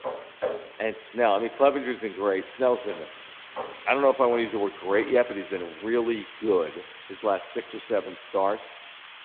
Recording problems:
echo of what is said; faint; throughout; 110 ms later, 20 dB below the speech
phone-call audio
hiss; noticeable; throughout; 15 dB below the speech
footsteps; noticeable; until 5 s; peak 5 dB below the speech

